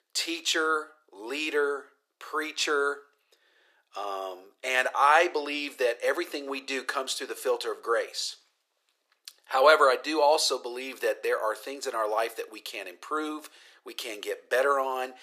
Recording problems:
thin; very; fading below 400 Hz

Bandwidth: 14.5 kHz